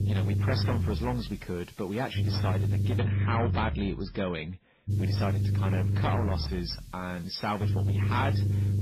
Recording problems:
garbled, watery; badly; nothing above 5.5 kHz
distortion; slight; 10 dB below the speech
low rumble; loud; throughout; 6 dB below the speech
hiss; faint; until 3 s and from 5 s on; 25 dB below the speech

